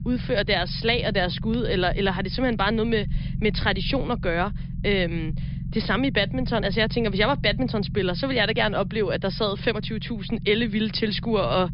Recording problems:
high frequencies cut off; noticeable; nothing above 5.5 kHz
low rumble; noticeable; throughout; 20 dB below the speech

